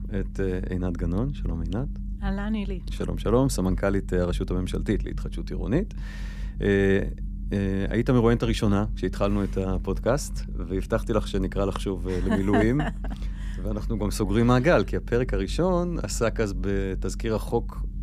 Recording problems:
low rumble; faint; throughout; 20 dB below the speech

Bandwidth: 14.5 kHz